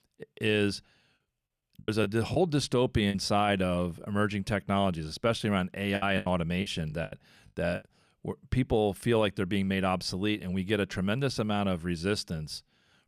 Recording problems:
choppy; very; from 2 to 3 s and from 6 to 8 s; 13% of the speech affected

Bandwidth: 14.5 kHz